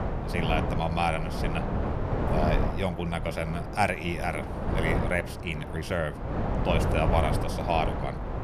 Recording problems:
wind noise on the microphone; heavy; 4 dB below the speech

